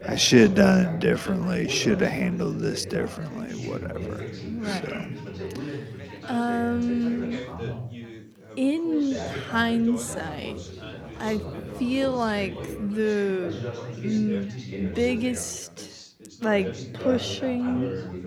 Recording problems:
wrong speed, natural pitch; too slow; 0.7 times normal speed
background chatter; noticeable; throughout; 4 voices, 10 dB below the speech

